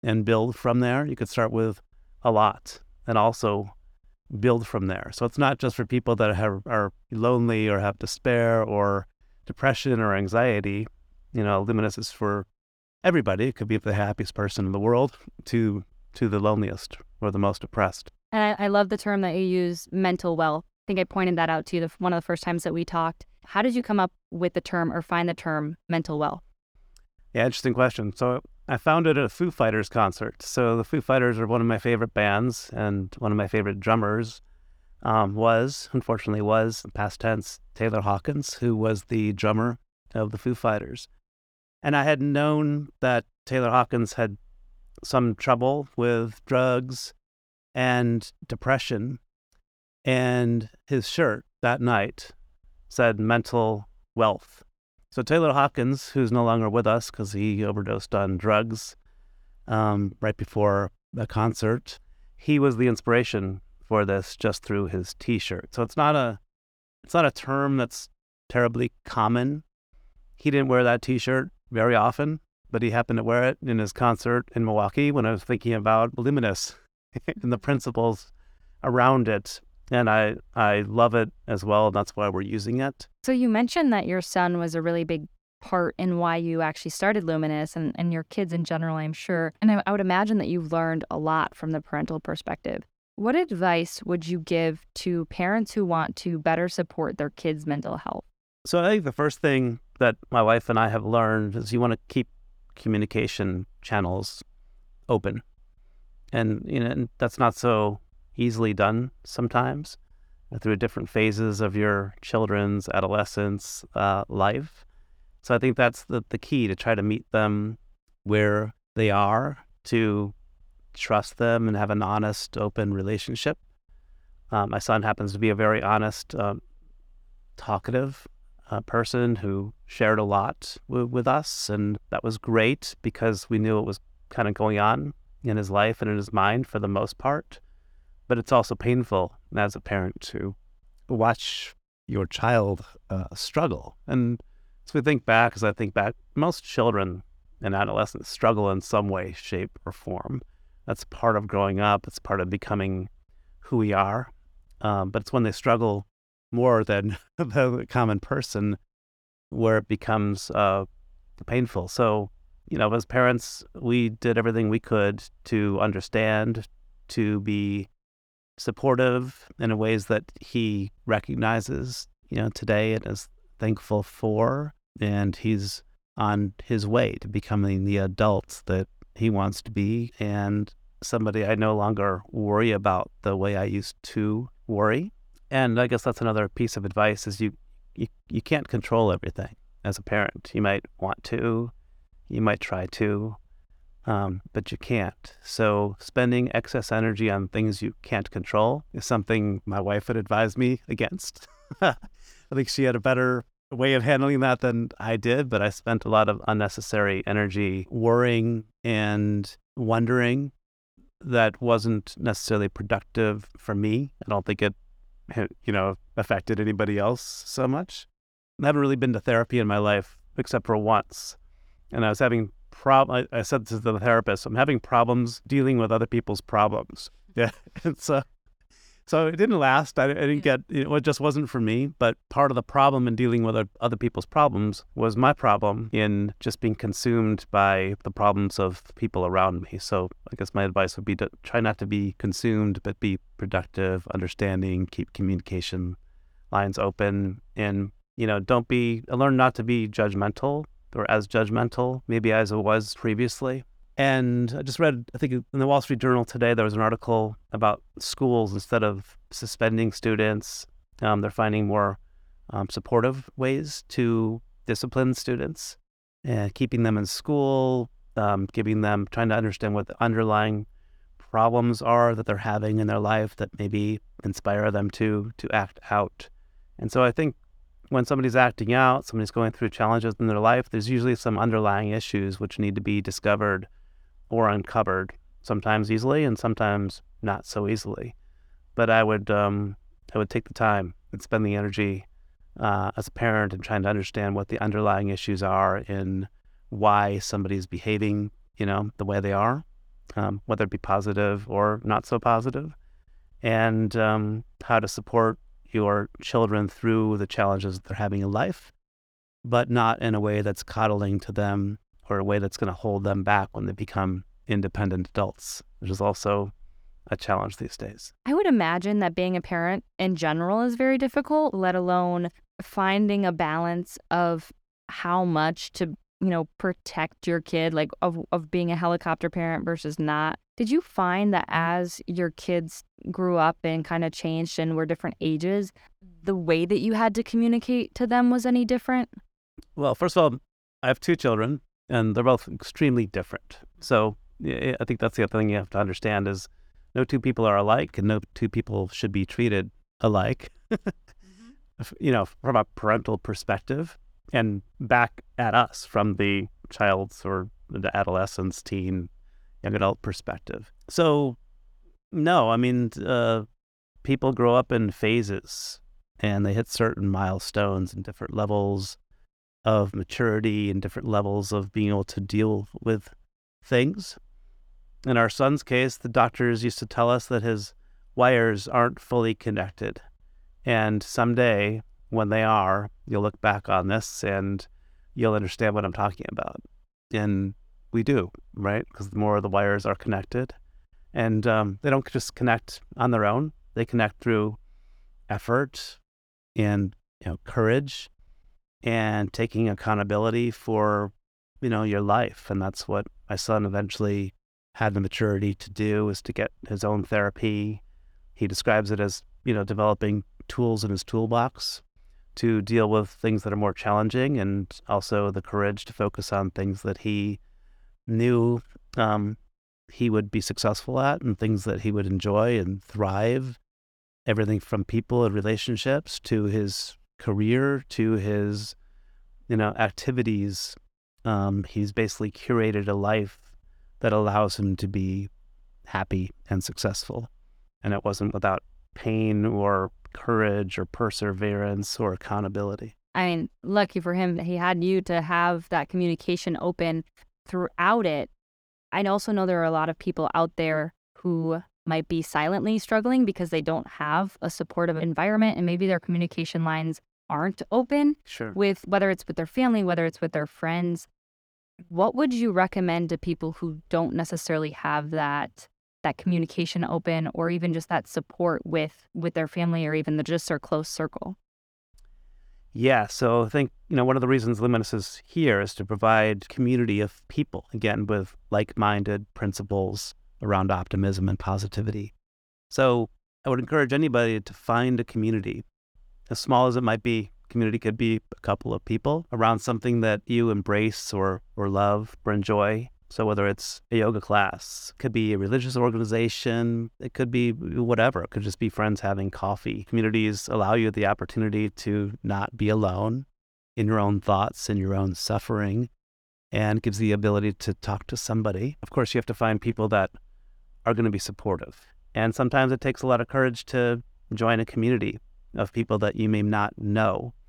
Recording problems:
none

